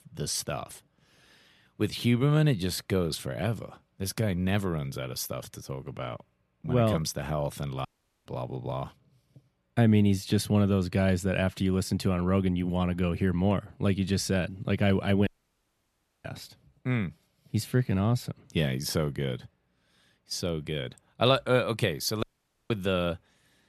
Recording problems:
audio cutting out; at 8 s, at 15 s for 1 s and at 22 s

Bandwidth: 13.5 kHz